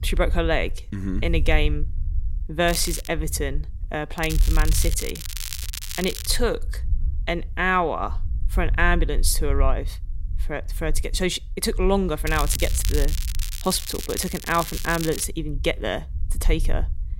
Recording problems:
crackling; loud; at 2.5 s, from 4 to 6.5 s and from 12 to 15 s; 7 dB below the speech
low rumble; faint; throughout; 25 dB below the speech

